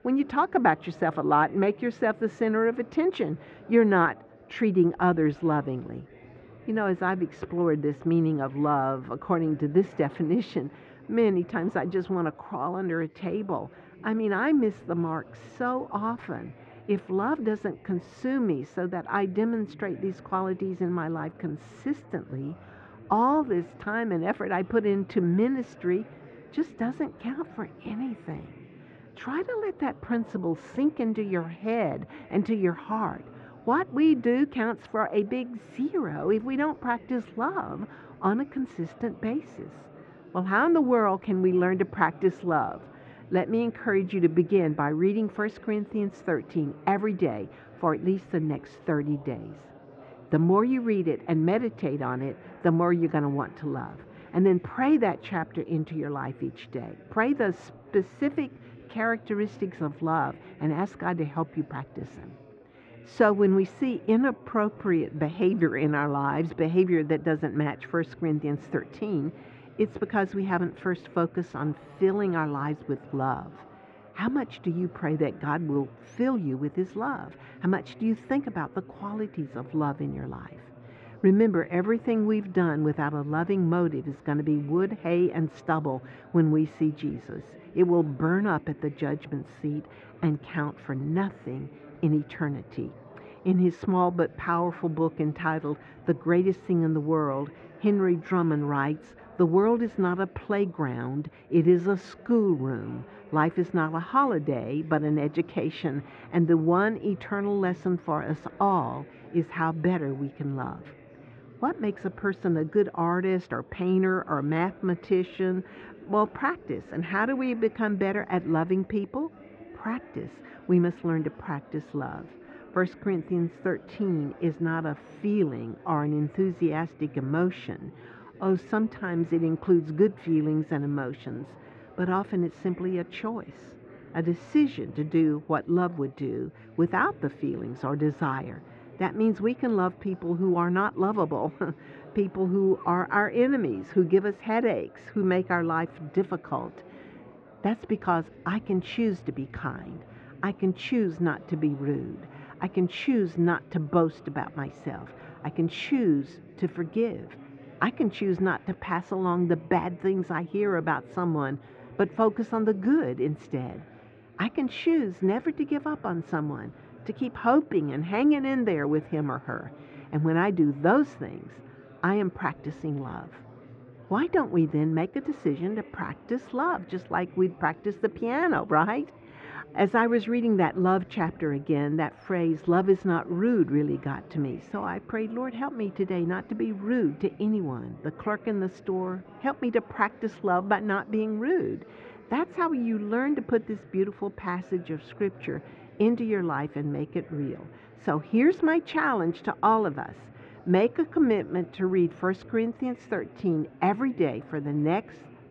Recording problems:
muffled; very; fading above 2 kHz
chatter from many people; faint; throughout; 20 dB below the speech
uneven, jittery; strongly; from 23 s to 3:24

